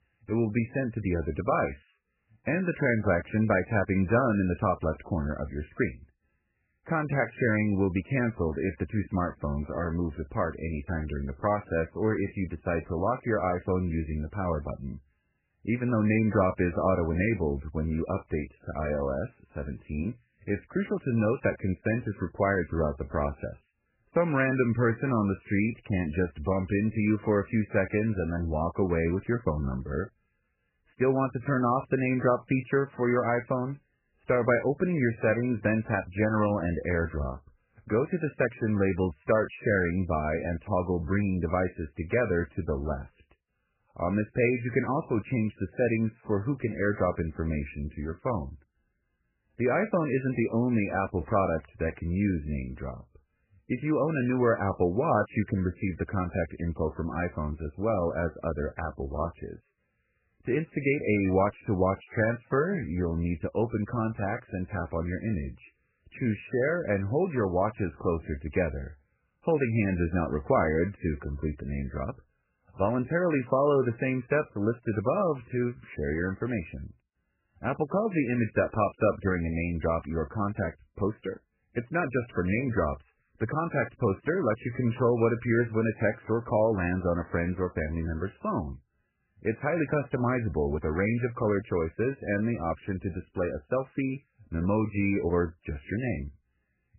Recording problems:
garbled, watery; badly; nothing above 2.5 kHz

